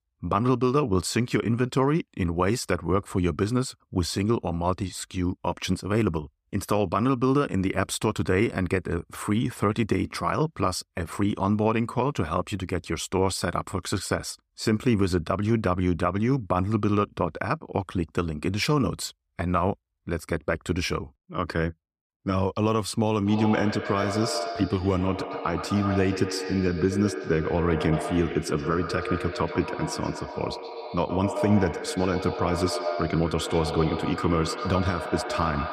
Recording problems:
echo of what is said; strong; from 23 s on; 120 ms later, 6 dB below the speech

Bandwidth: 15 kHz